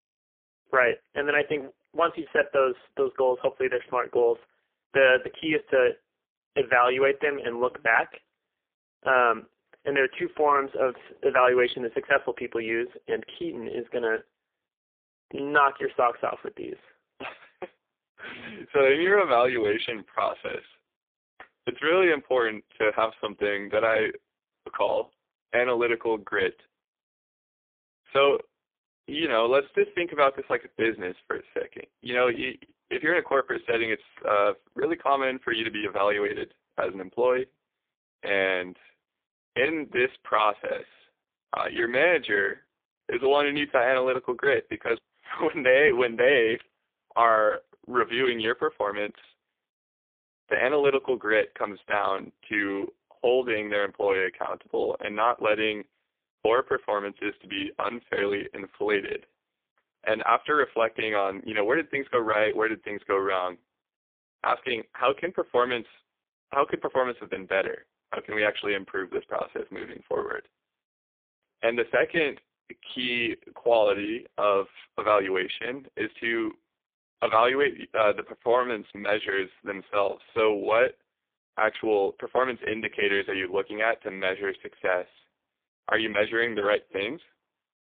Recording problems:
phone-call audio; poor line

